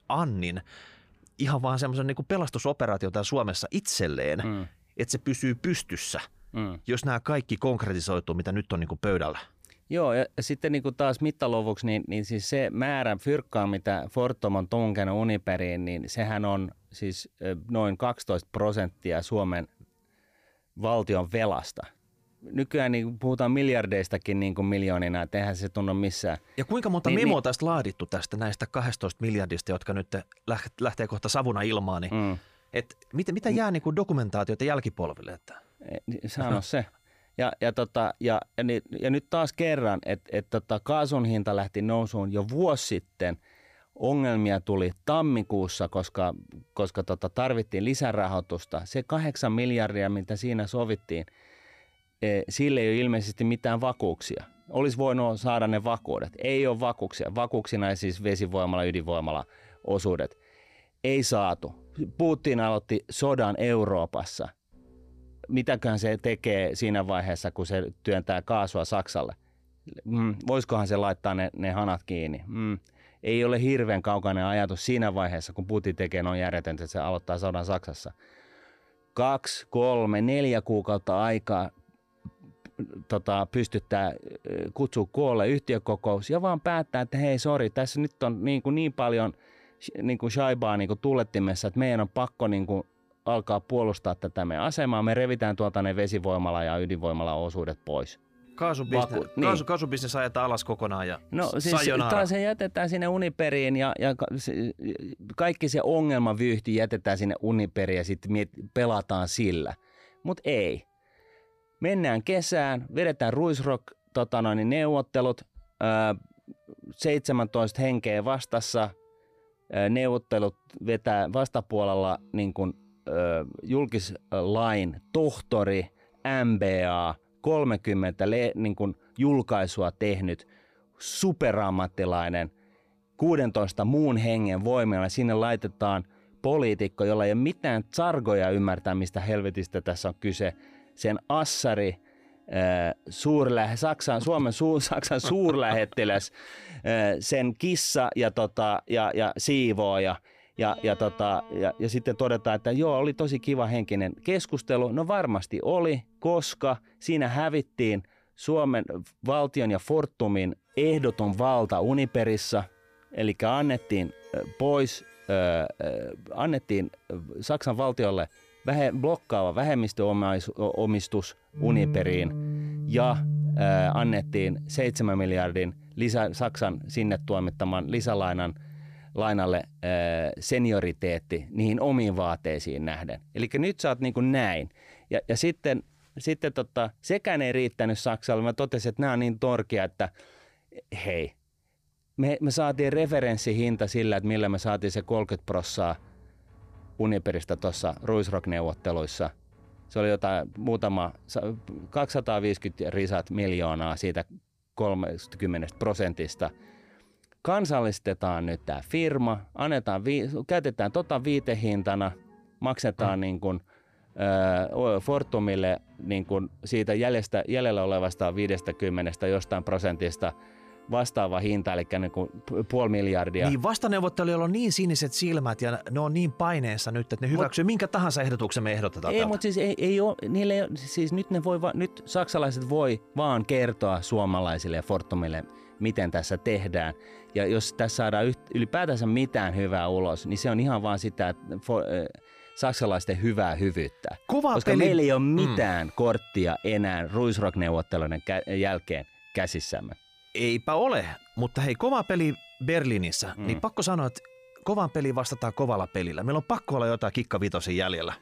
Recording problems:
background music; noticeable; throughout; 15 dB below the speech

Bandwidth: 15 kHz